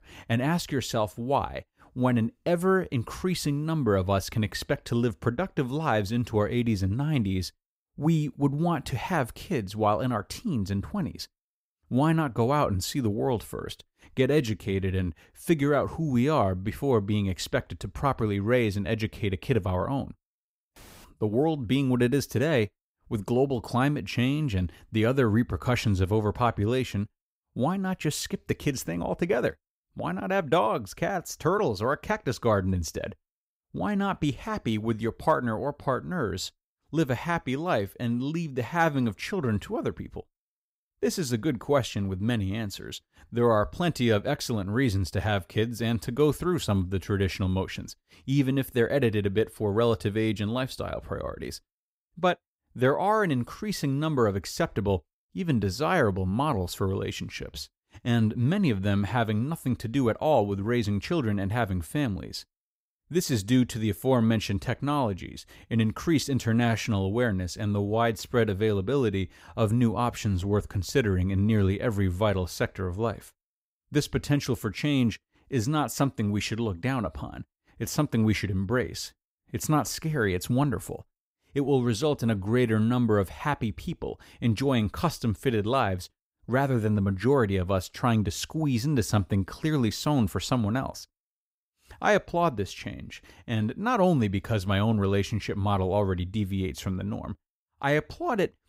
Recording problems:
none

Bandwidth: 15.5 kHz